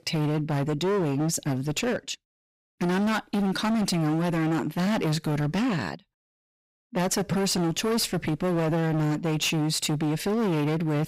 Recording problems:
distortion; heavy; 28% of the sound clipped

